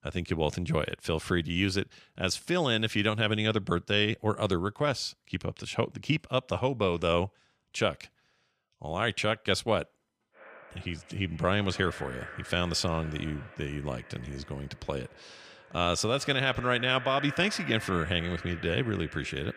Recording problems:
echo of what is said; noticeable; from 10 s on; 150 ms later, 15 dB below the speech

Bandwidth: 14.5 kHz